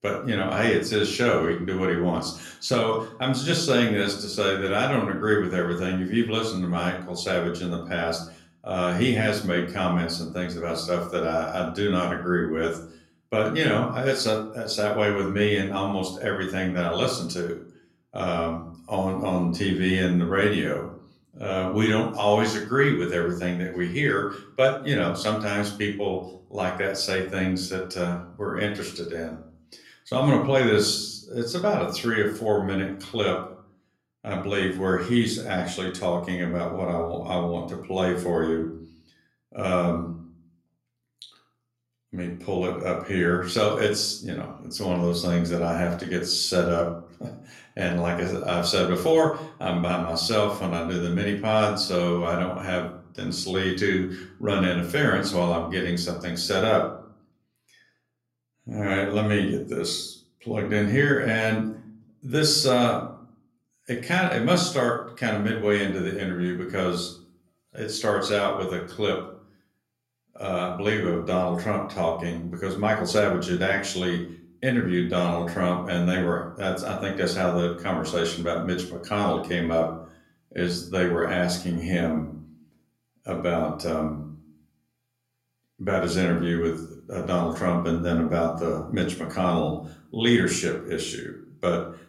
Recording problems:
room echo; slight; dies away in 0.5 s
off-mic speech; somewhat distant

